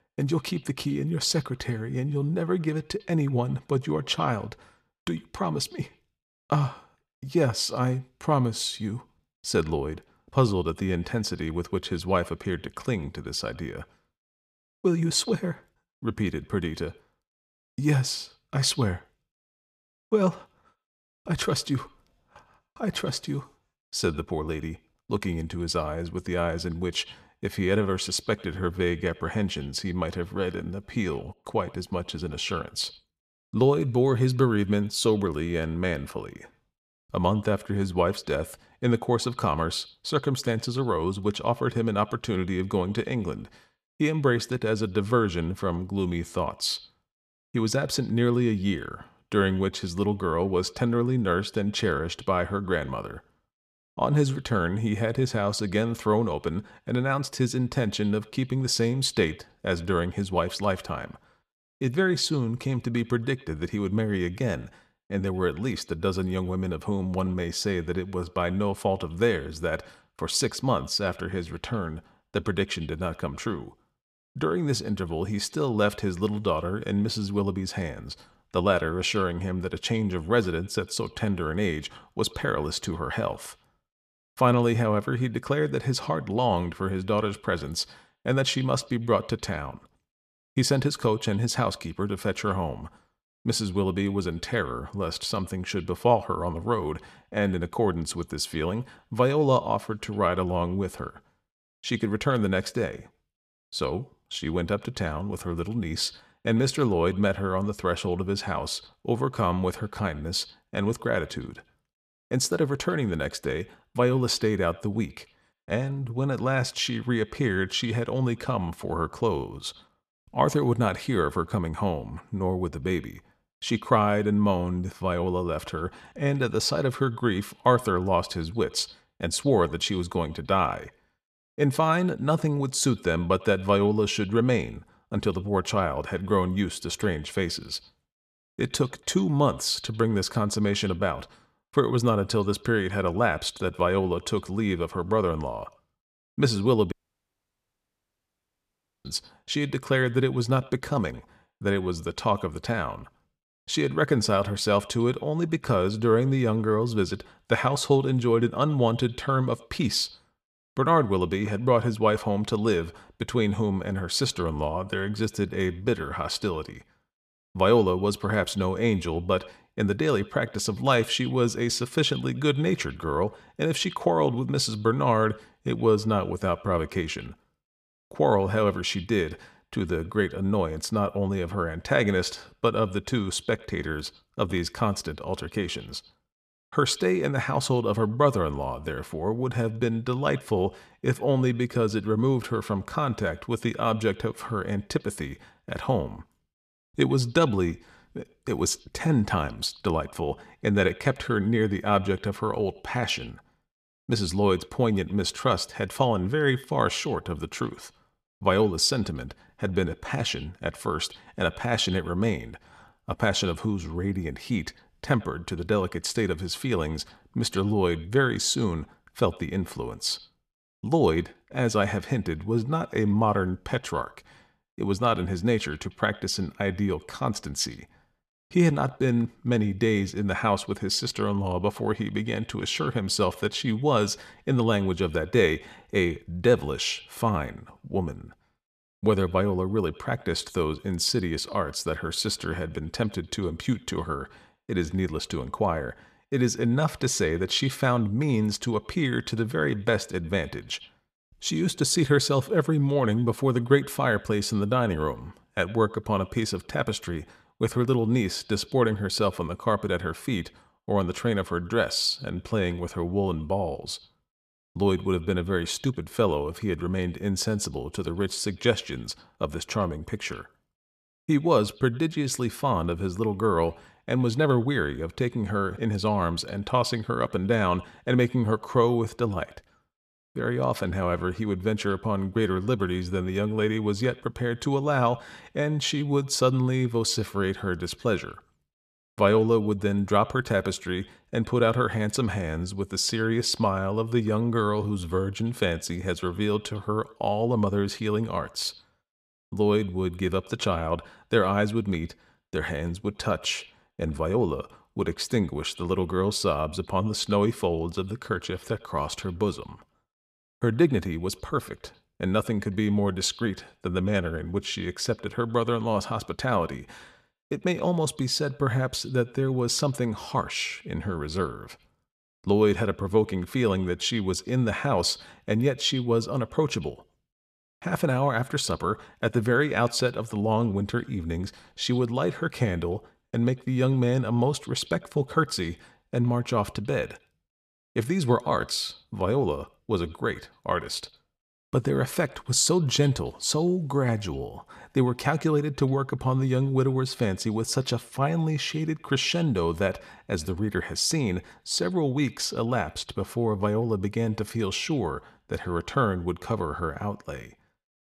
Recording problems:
echo of what is said; faint; throughout; 100 ms later, 25 dB below the speech
audio cutting out; at 2:27 for 2 s

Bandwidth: 14.5 kHz